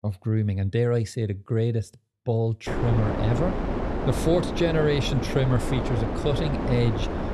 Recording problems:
wind noise on the microphone; heavy; from 2.5 s on; 2 dB below the speech

